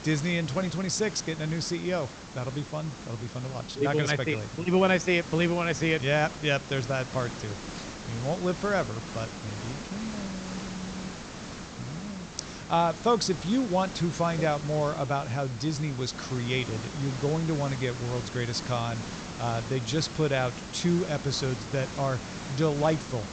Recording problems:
high frequencies cut off; noticeable; nothing above 8 kHz
hiss; noticeable; throughout; 10 dB below the speech

